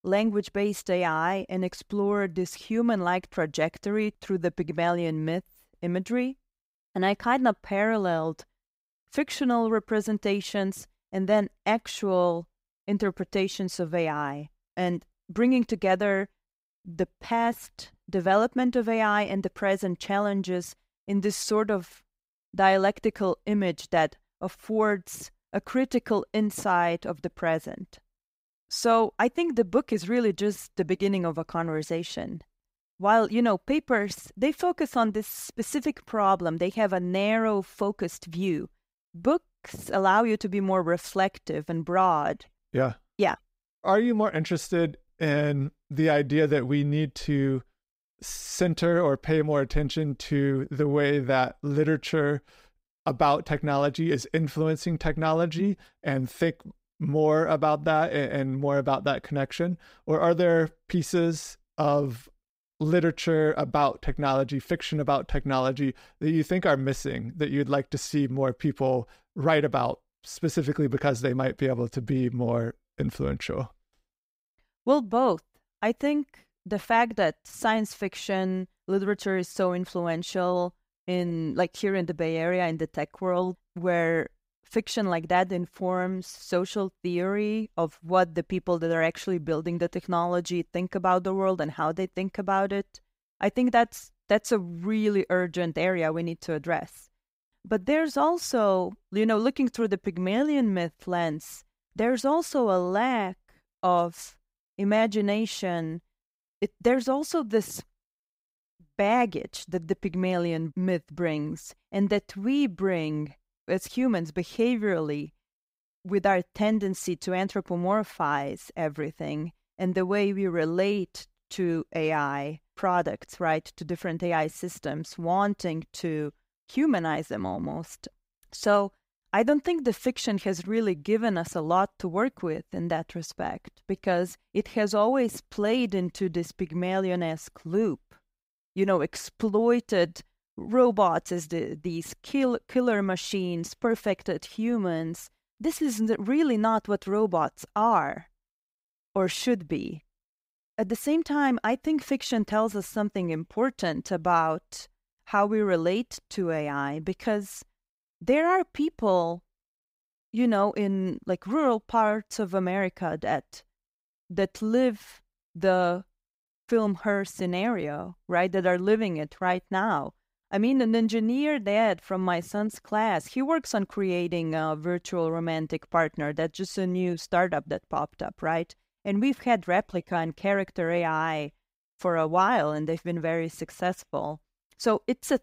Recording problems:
none

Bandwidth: 15.5 kHz